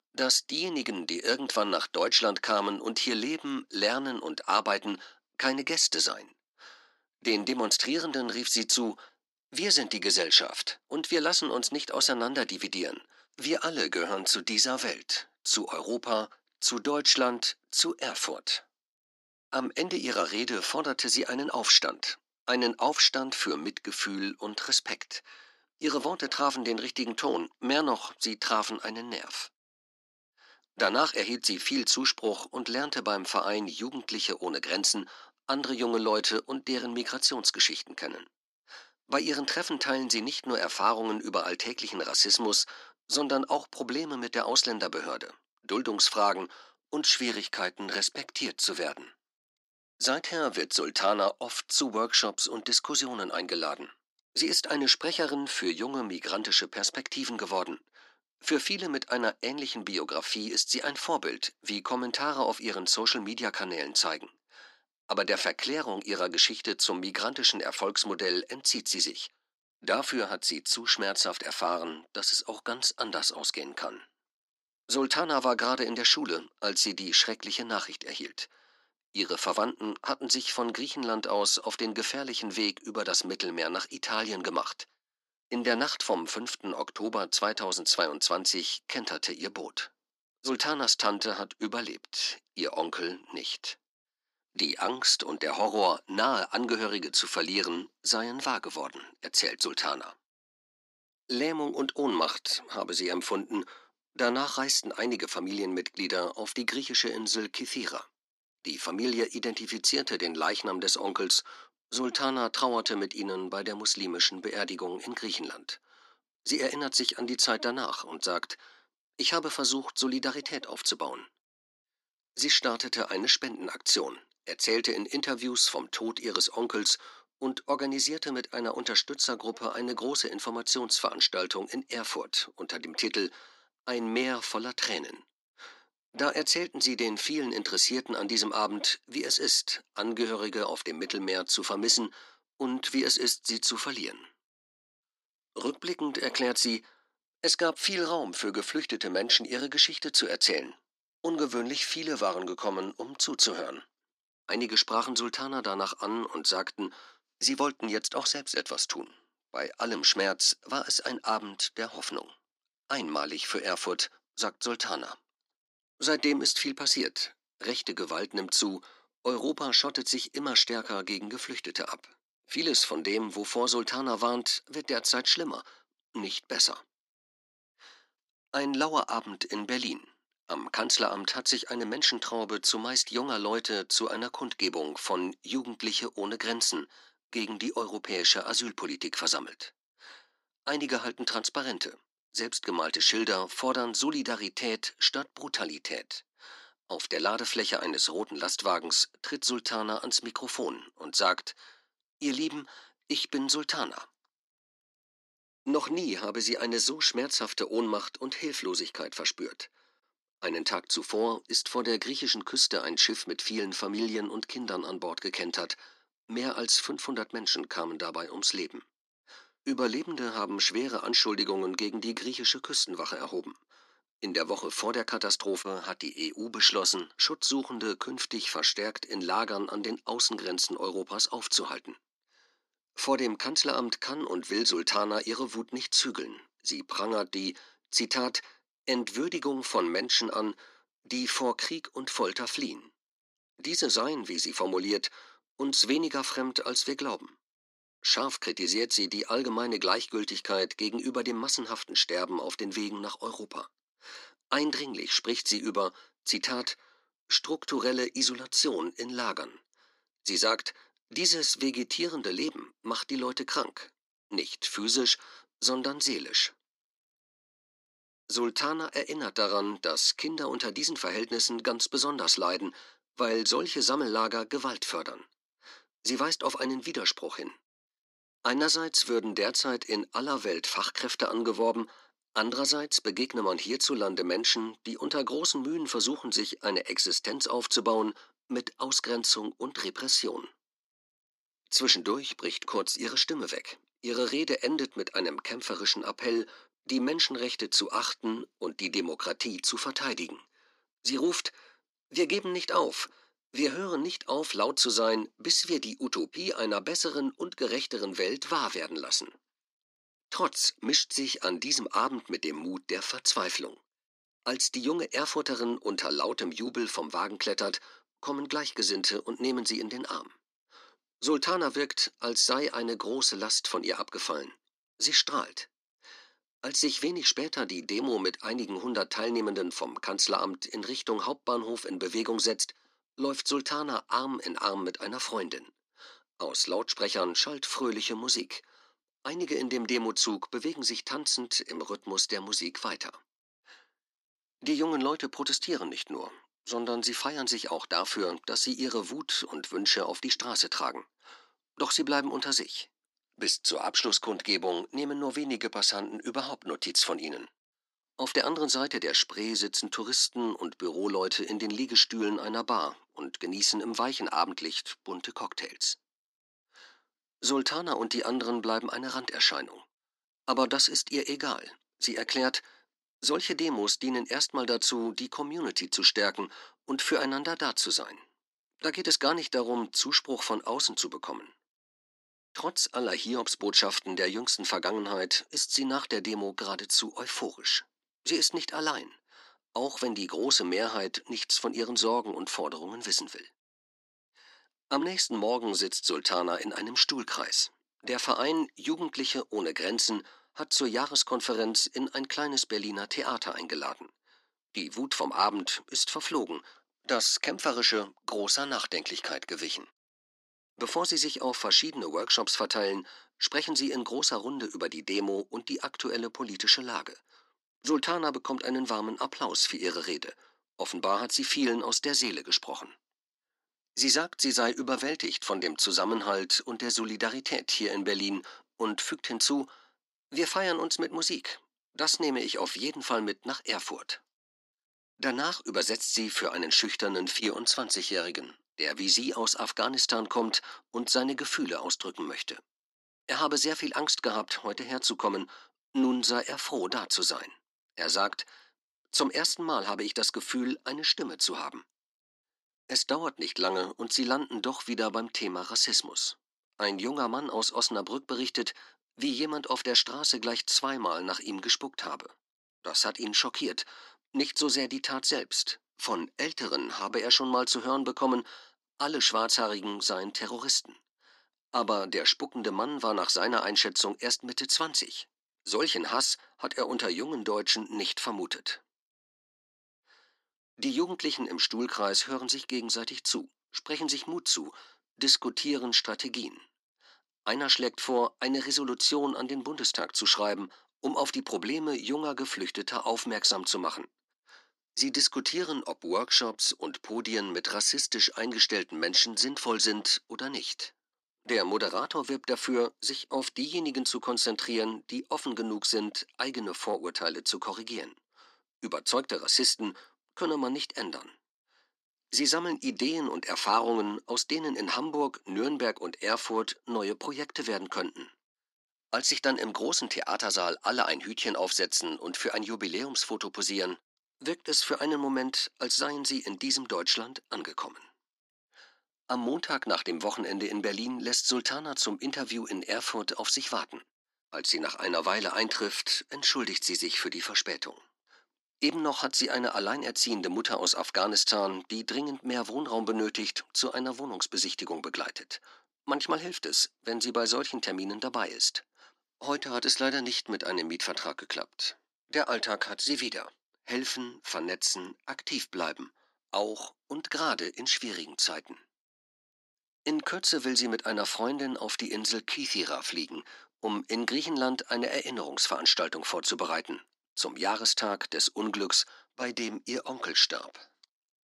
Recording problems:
thin; somewhat; fading below 250 Hz

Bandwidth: 14.5 kHz